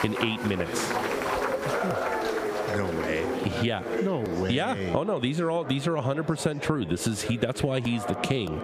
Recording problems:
squashed, flat; heavily, background pumping
household noises; loud; throughout; 8 dB below the speech
murmuring crowd; loud; throughout; 4 dB below the speech

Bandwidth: 15 kHz